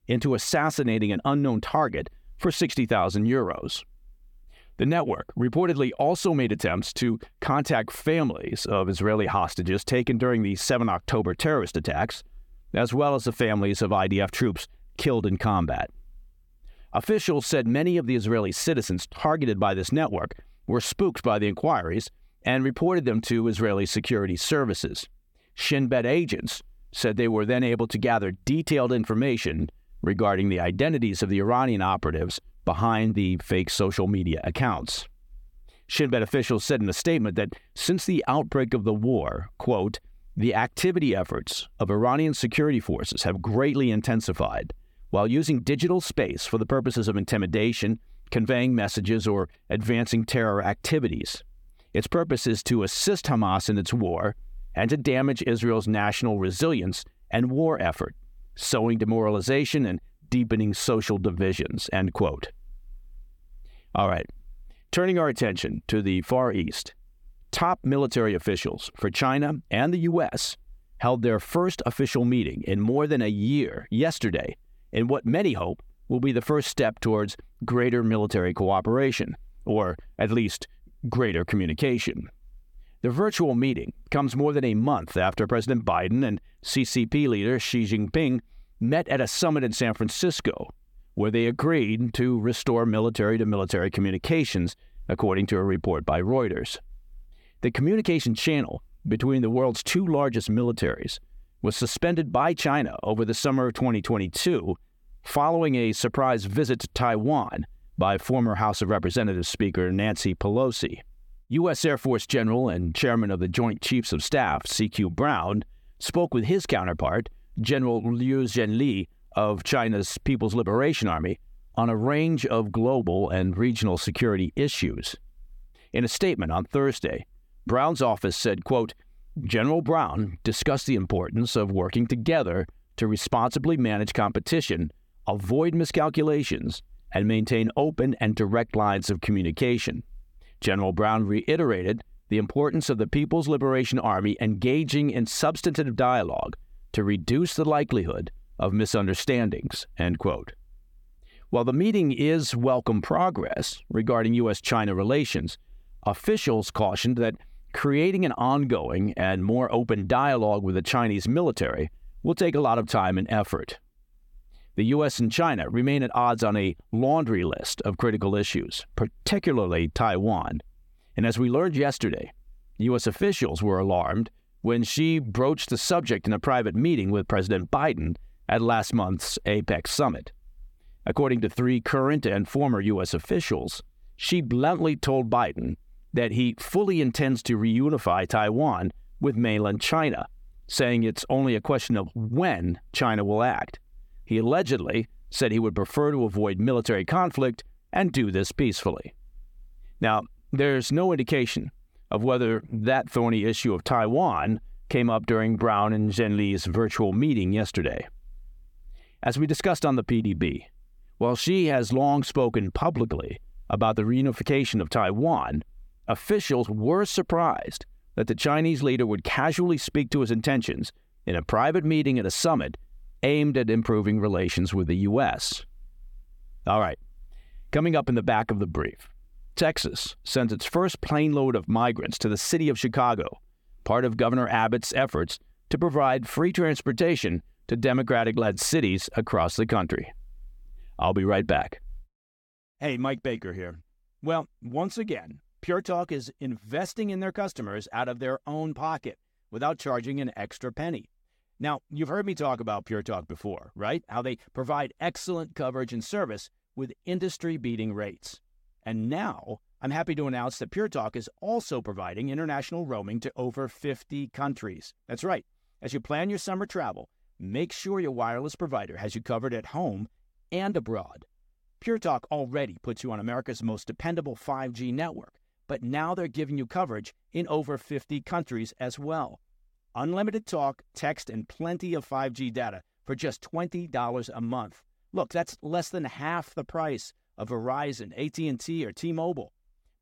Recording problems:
none

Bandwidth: 18 kHz